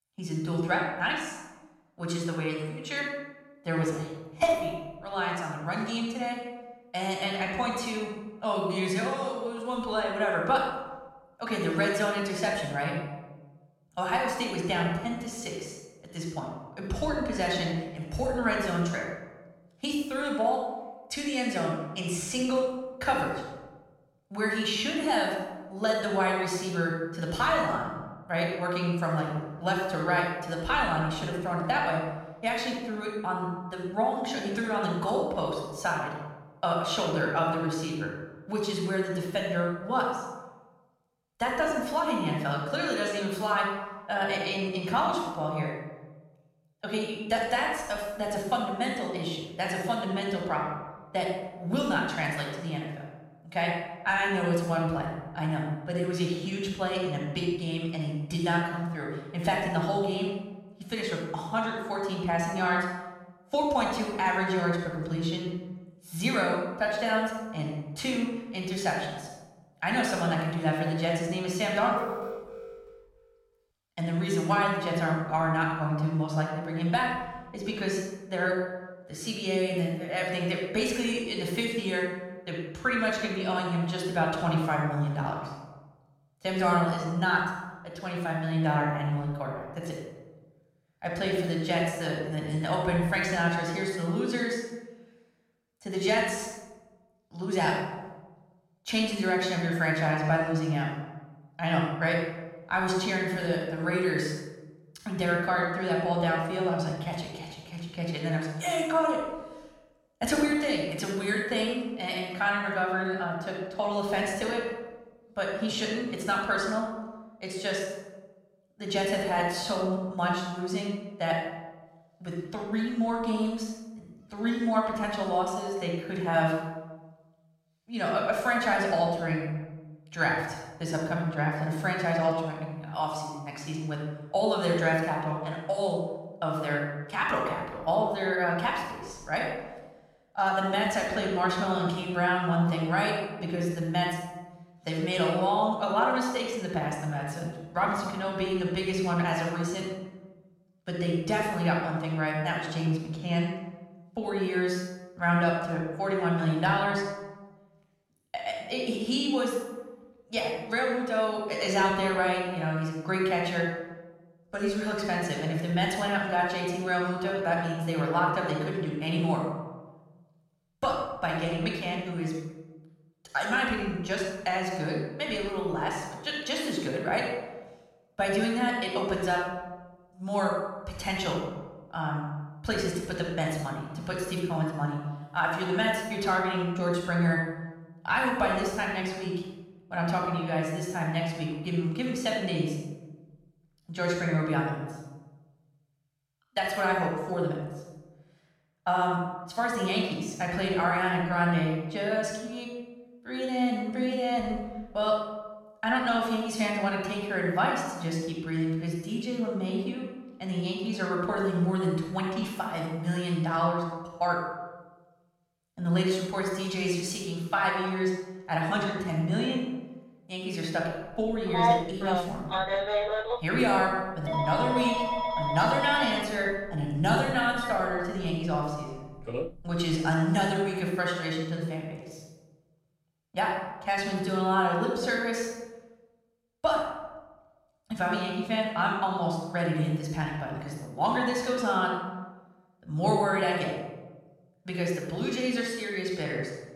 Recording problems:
room echo; noticeable; dies away in 1 s
off-mic speech; somewhat distant
alarm; noticeable; from 1:12 to 1:13; peak 8 dB below the speech
phone ringing; loud; from 3:41 to 3:49; peak 5 dB above the speech

